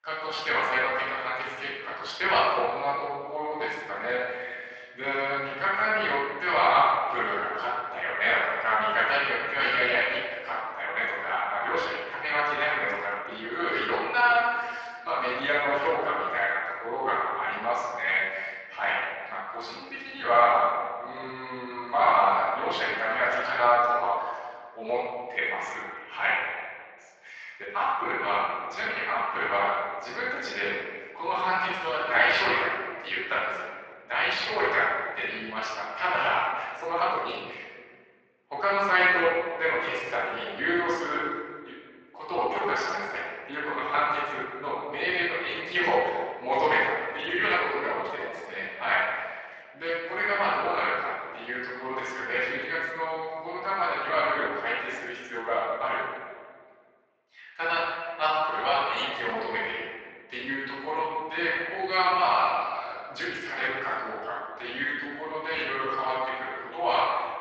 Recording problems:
off-mic speech; far
thin; very; fading below 750 Hz
room echo; noticeable; dies away in 1.6 s
garbled, watery; slightly
uneven, jittery; strongly; from 2 to 59 s

